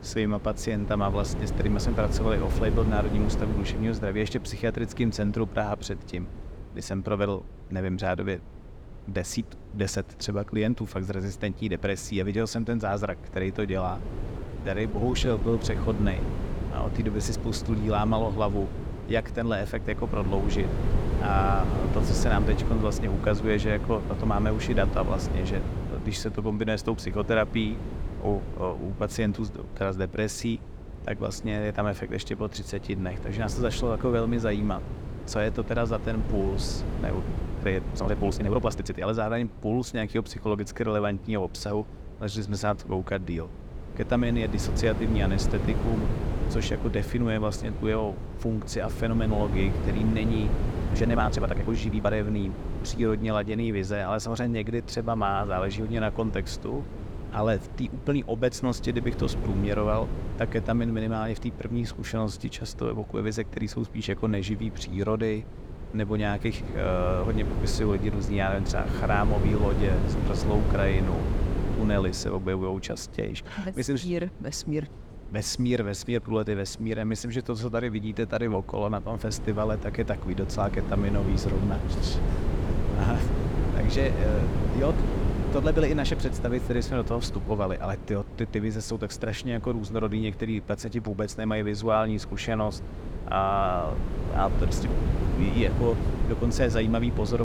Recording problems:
wind noise on the microphone; heavy; 8 dB below the speech
uneven, jittery; strongly; from 14 to 52 s
abrupt cut into speech; at the end

